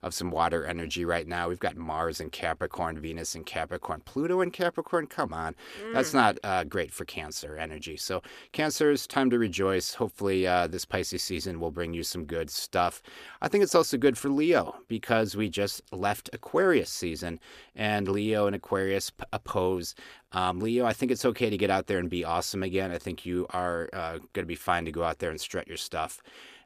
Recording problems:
none

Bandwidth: 14.5 kHz